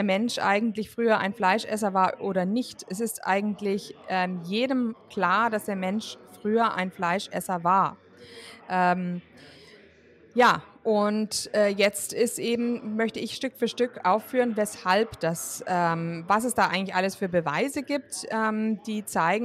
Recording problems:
background chatter; faint; throughout; 4 voices, 25 dB below the speech
abrupt cut into speech; at the start and the end

